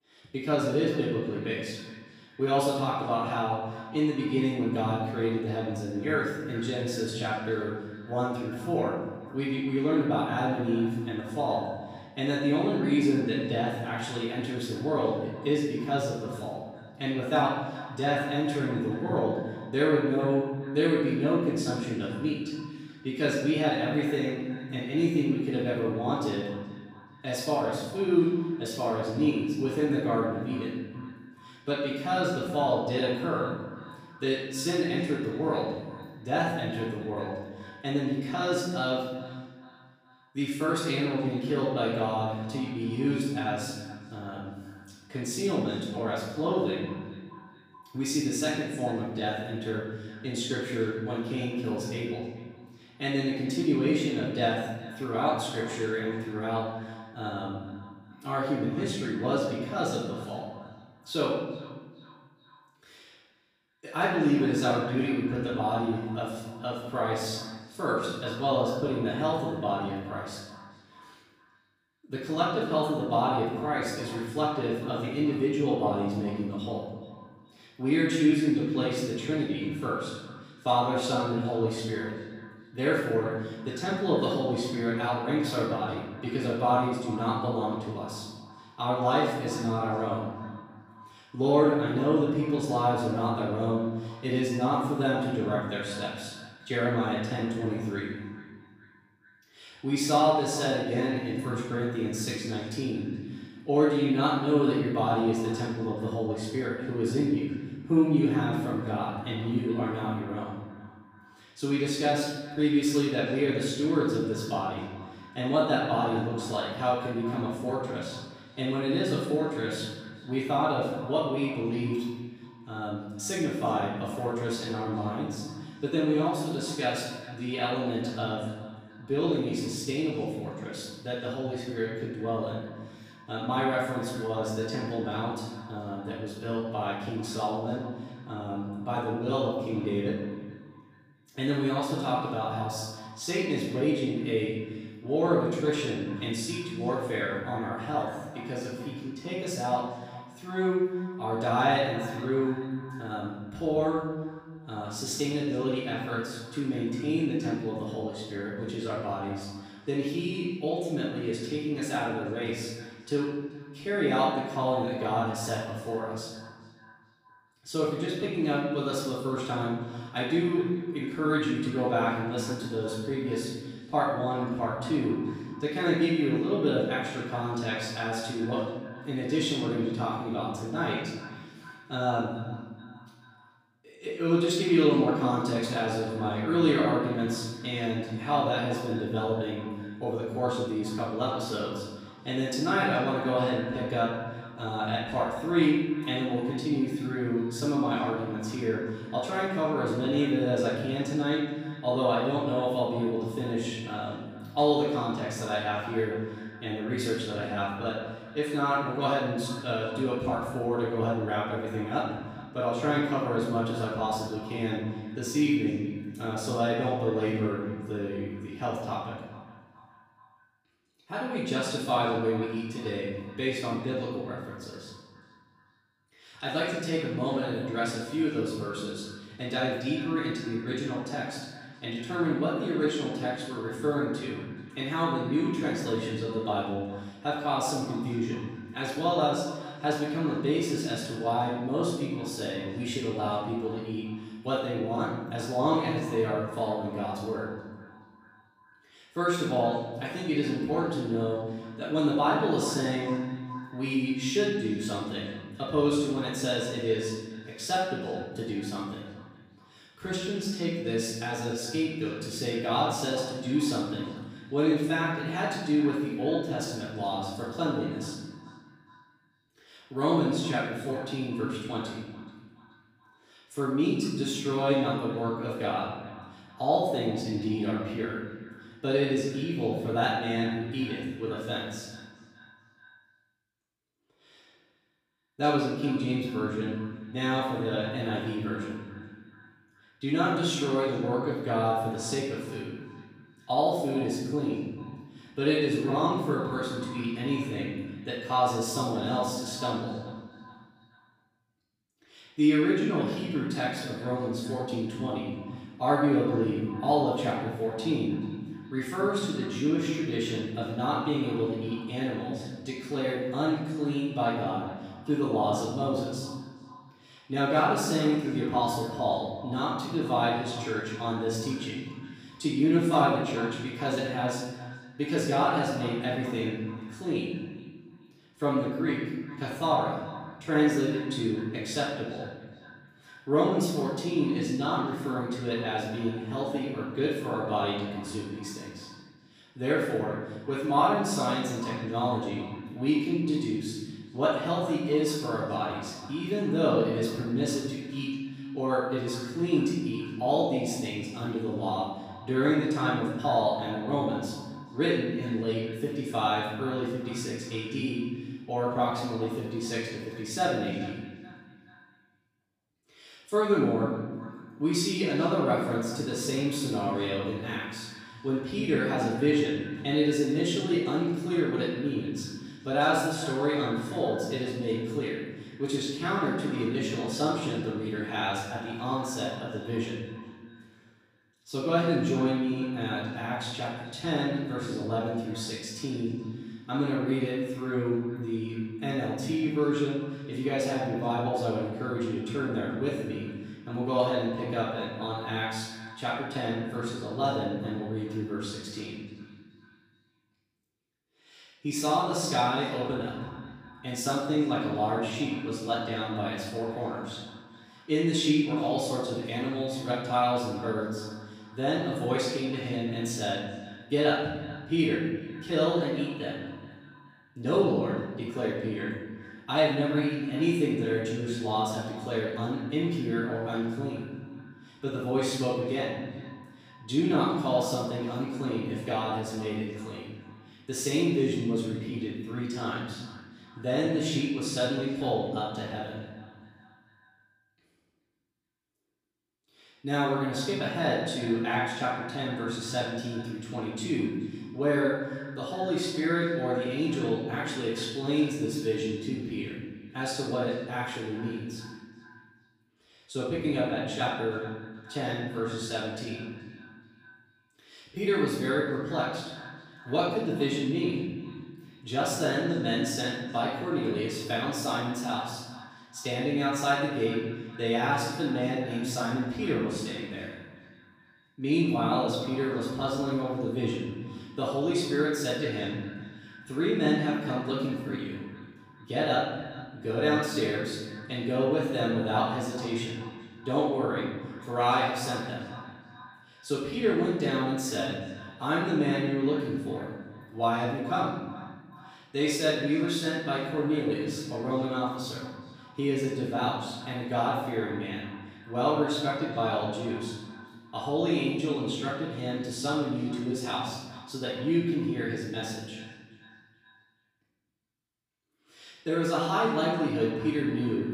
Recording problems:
off-mic speech; far
room echo; noticeable; dies away in 1.3 s
echo of what is said; faint; throughout; 430 ms later, 20 dB below the speech

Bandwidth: 15 kHz